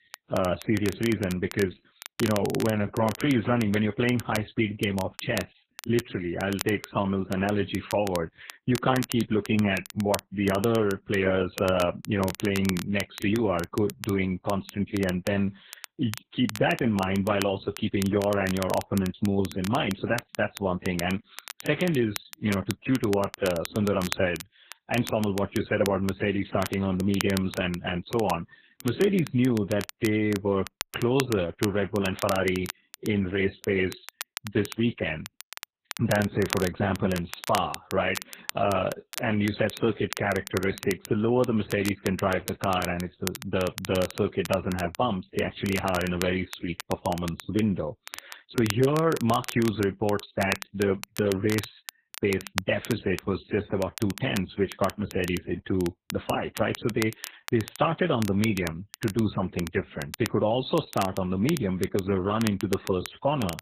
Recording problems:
garbled, watery; badly; nothing above 4 kHz
crackle, like an old record; noticeable; 10 dB below the speech

